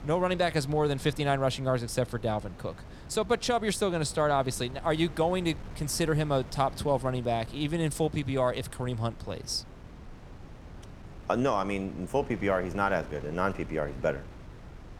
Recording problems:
wind noise on the microphone; occasional gusts; 20 dB below the speech

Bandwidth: 17.5 kHz